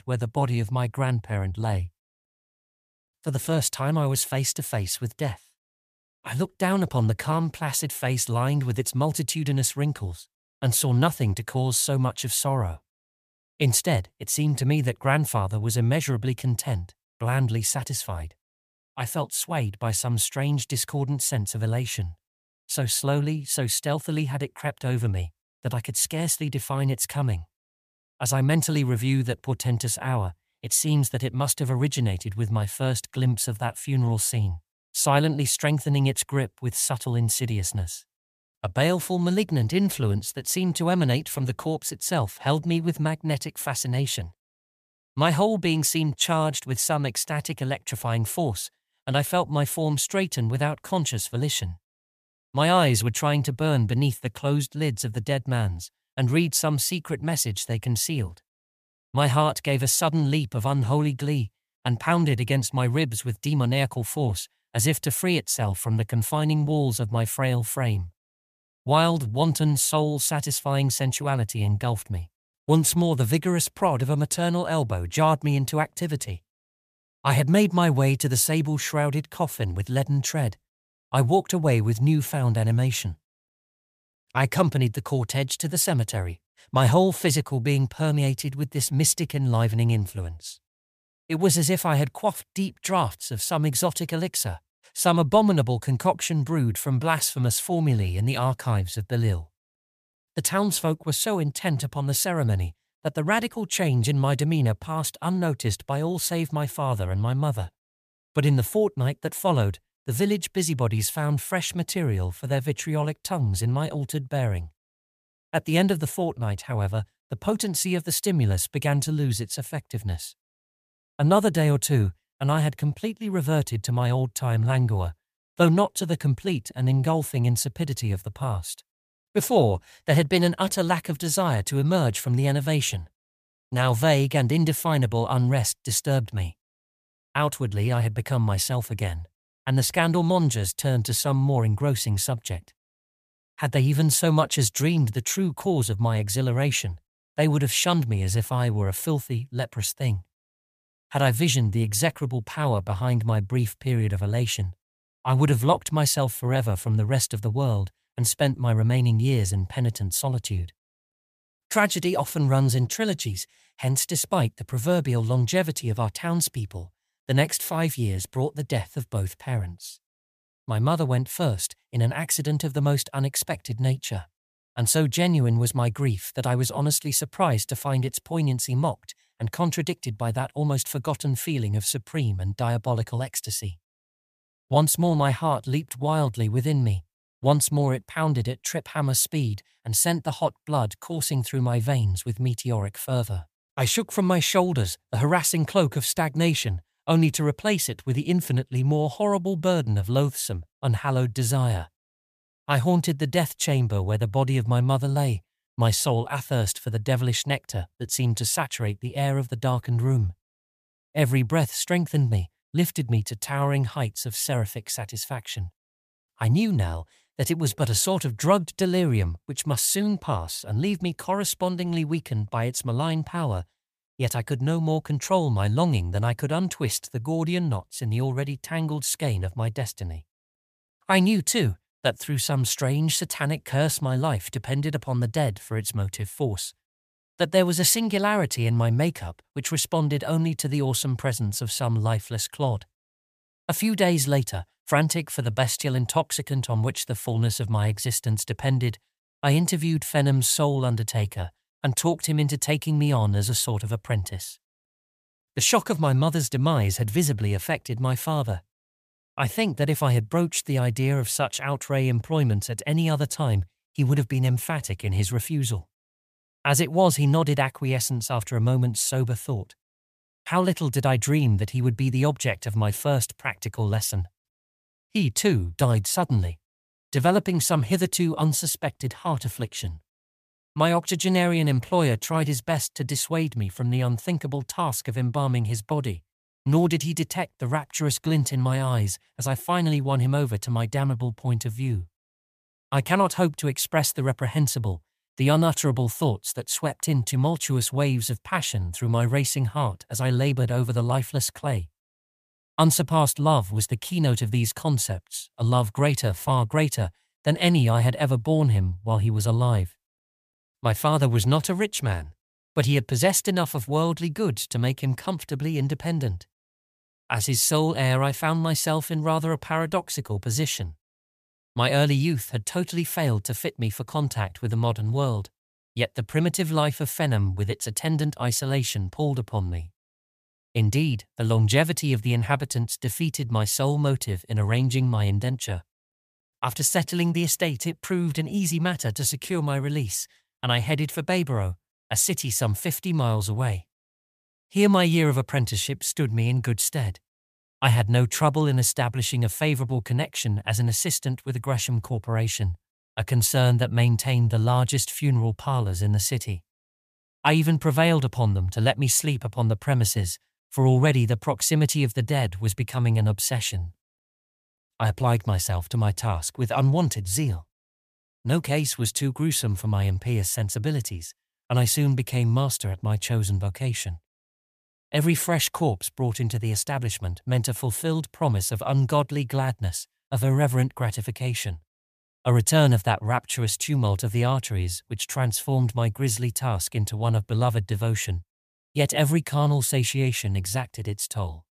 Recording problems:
none

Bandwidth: 14.5 kHz